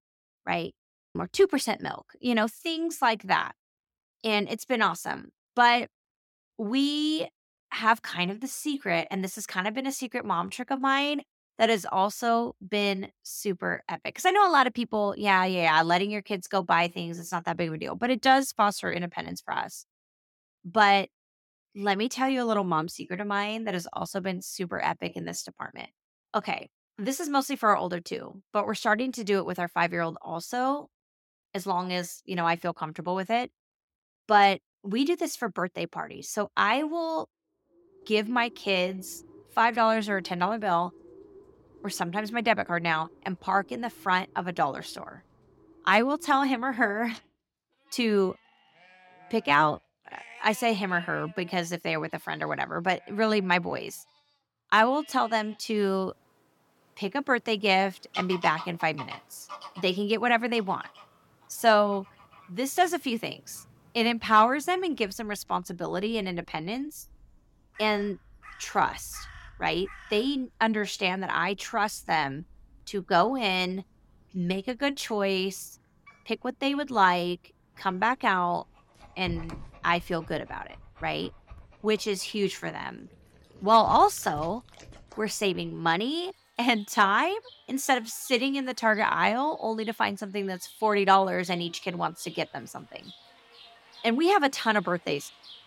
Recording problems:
animal sounds; faint; from 38 s on; 25 dB below the speech

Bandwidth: 17 kHz